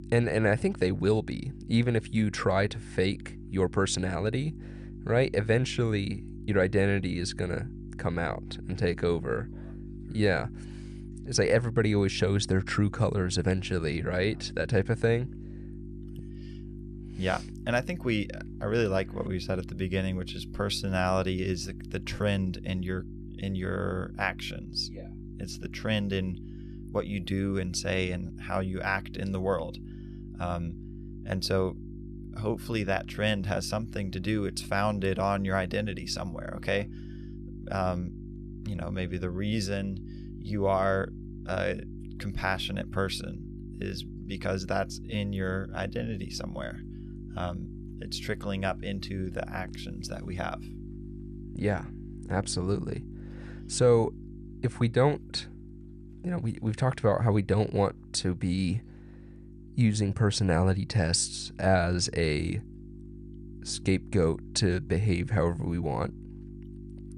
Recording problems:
electrical hum; noticeable; throughout; 50 Hz, 20 dB below the speech

